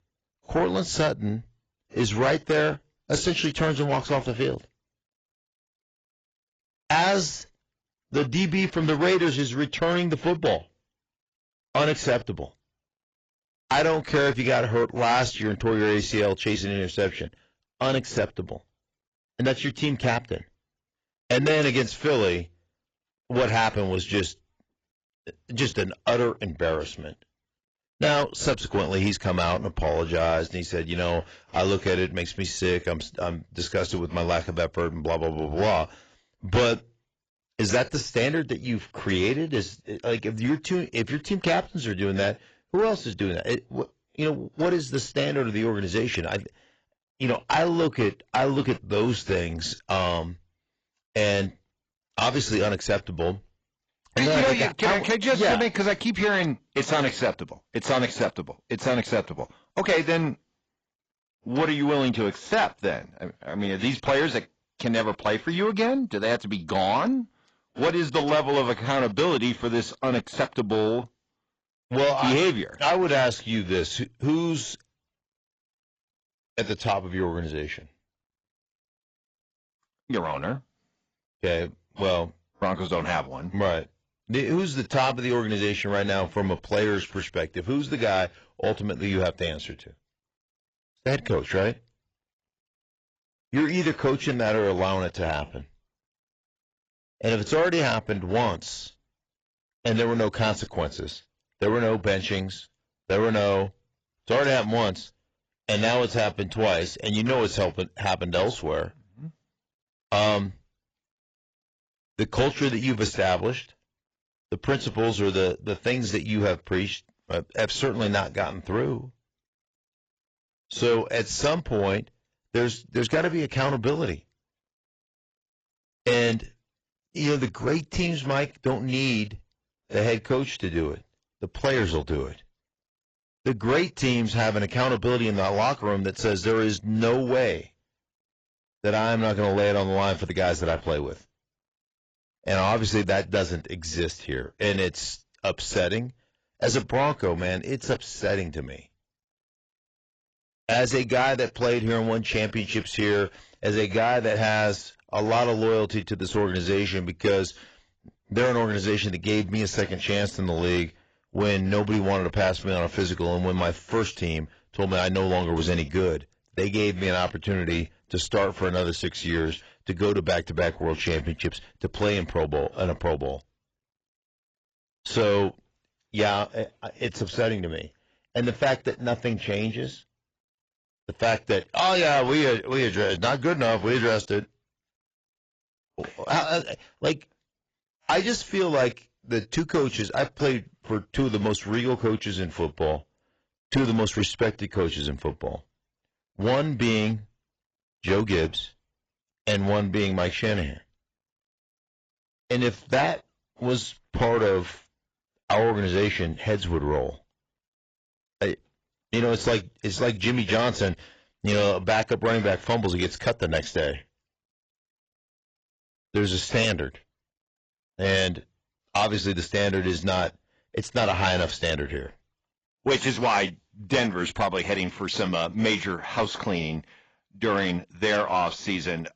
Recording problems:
garbled, watery; badly; nothing above 7.5 kHz
distortion; slight; 10 dB below the speech

